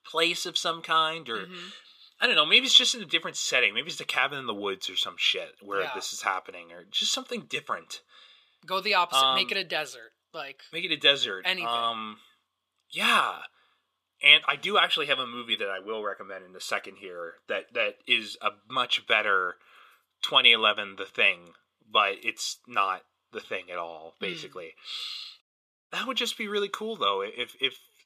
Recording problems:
thin; somewhat; fading below 400 Hz
audio cutting out; at 25 s

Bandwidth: 14.5 kHz